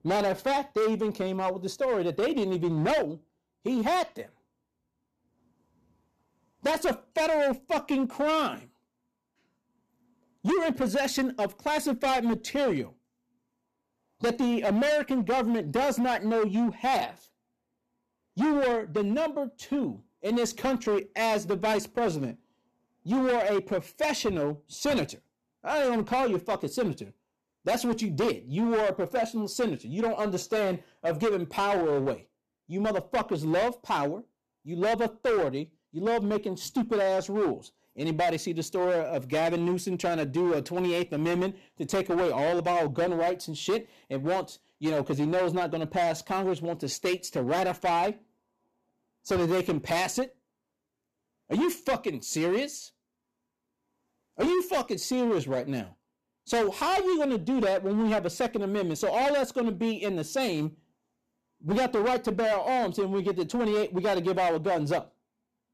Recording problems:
distortion; heavy; 14% of the sound clipped

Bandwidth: 13.5 kHz